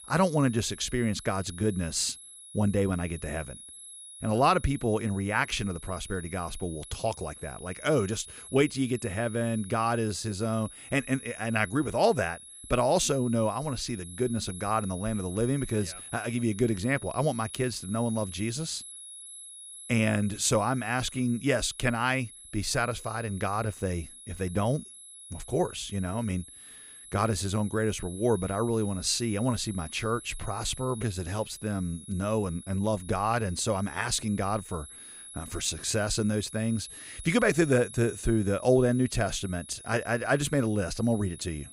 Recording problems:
high-pitched whine; noticeable; throughout; 10.5 kHz, 15 dB below the speech

